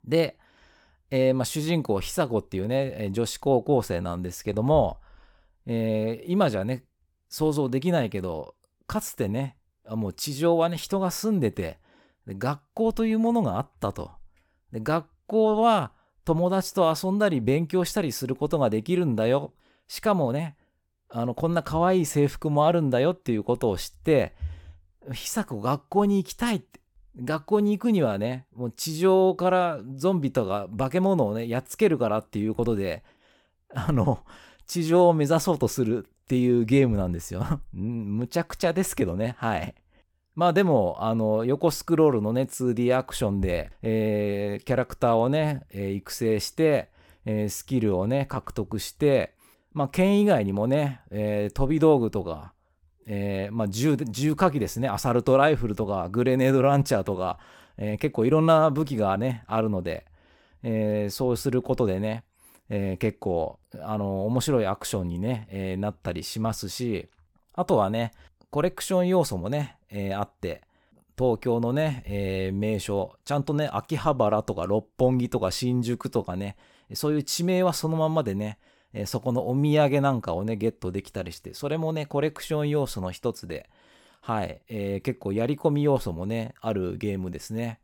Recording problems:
none

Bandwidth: 17 kHz